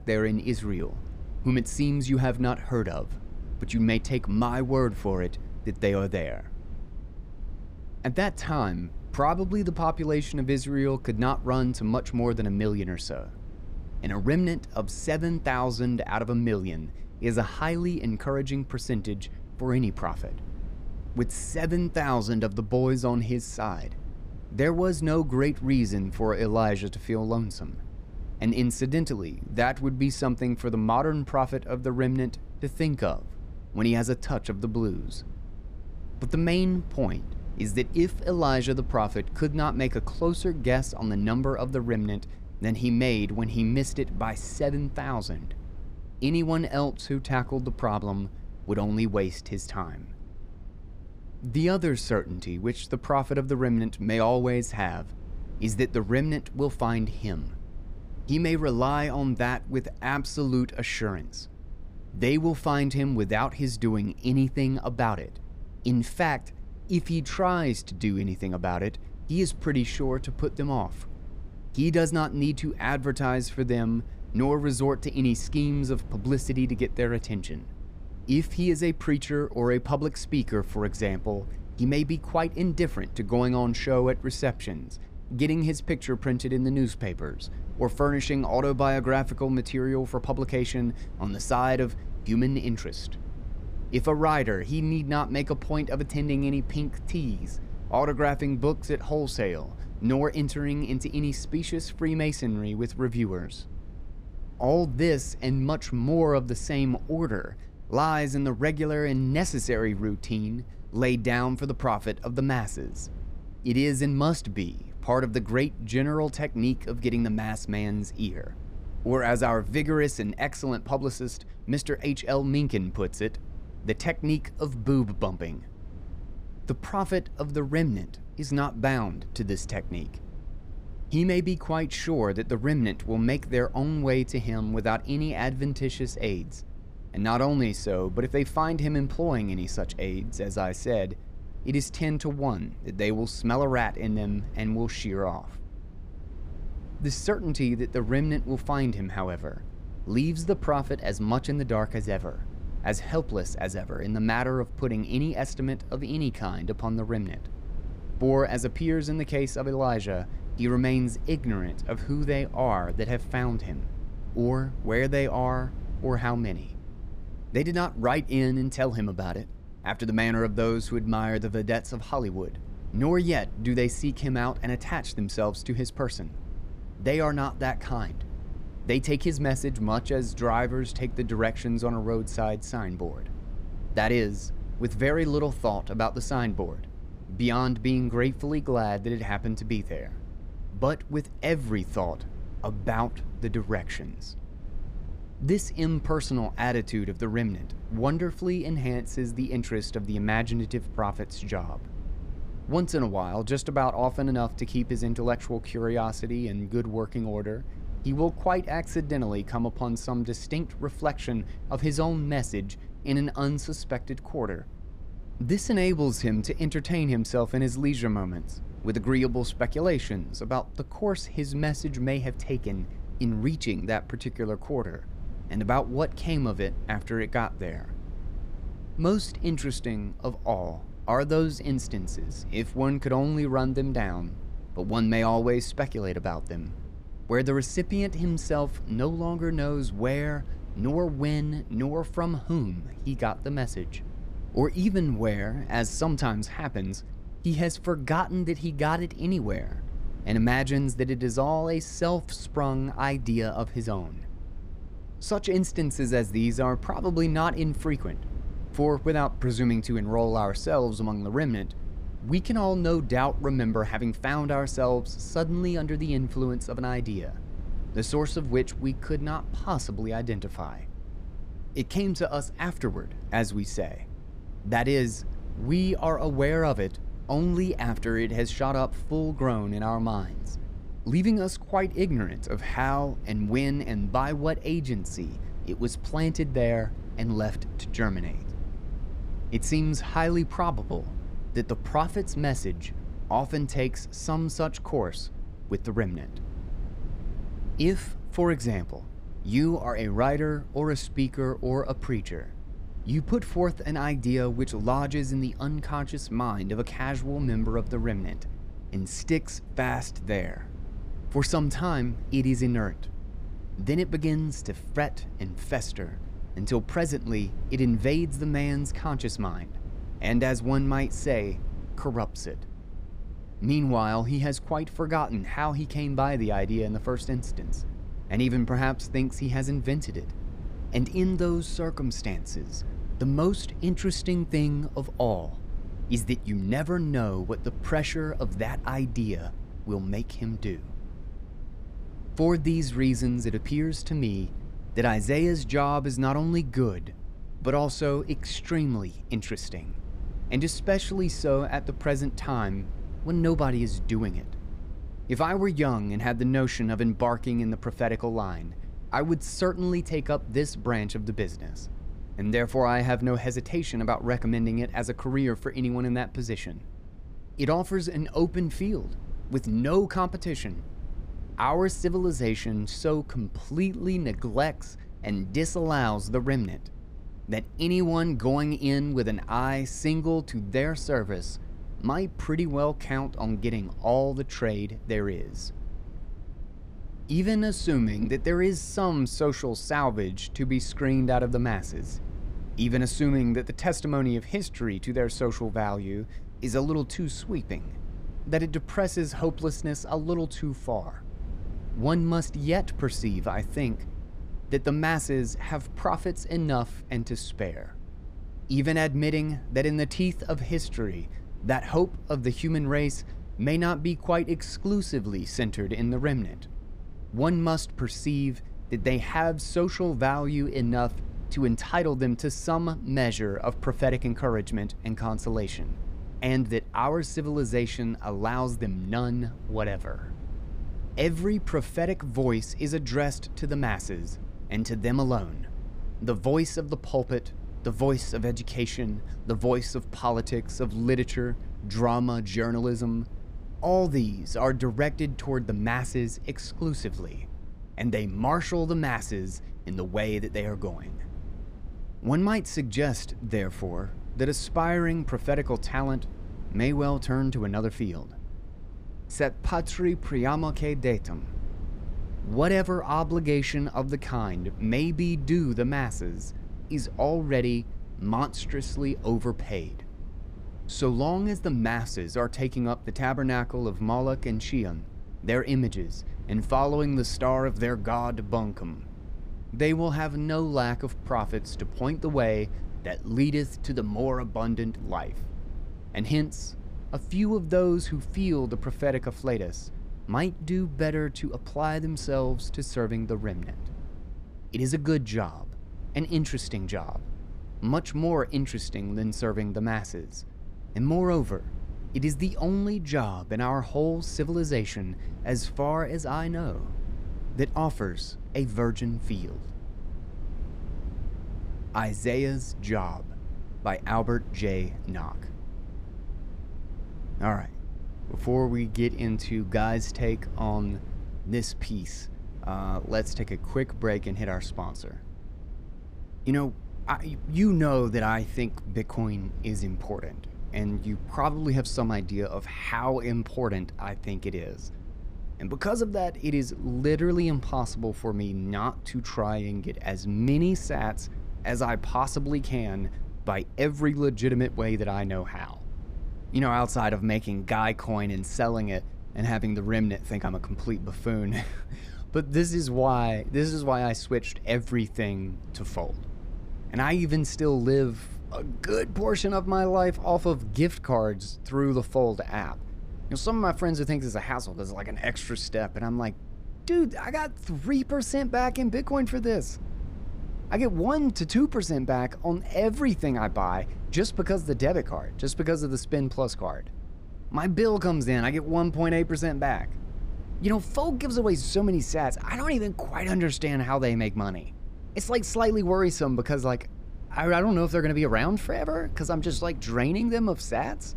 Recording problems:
low rumble; faint; throughout; 25 dB below the speech

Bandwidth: 15 kHz